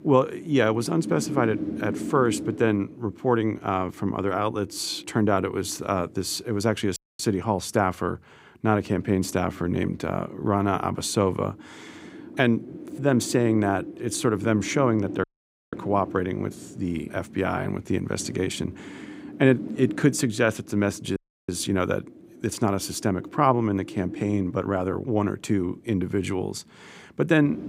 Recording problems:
wind noise on the microphone; occasional gusts; 15 dB below the speech
audio cutting out; at 7 s, at 15 s and at 21 s

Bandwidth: 15.5 kHz